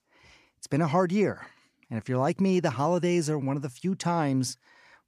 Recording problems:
none

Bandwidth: 14.5 kHz